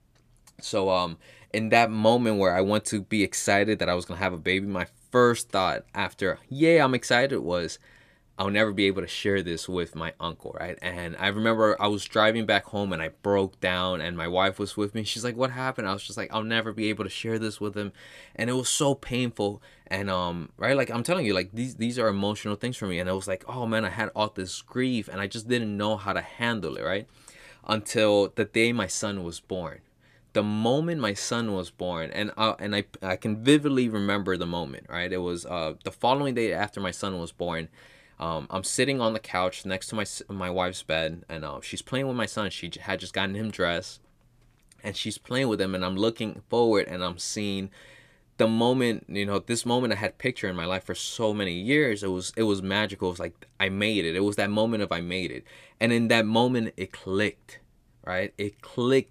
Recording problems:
none

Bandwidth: 14.5 kHz